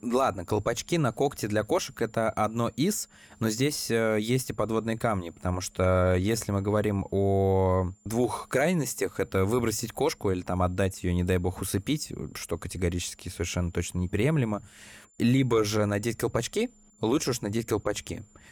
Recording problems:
high-pitched whine; faint; throughout; 7 kHz, 35 dB below the speech

